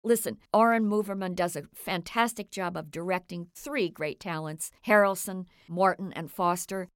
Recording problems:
none

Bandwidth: 16.5 kHz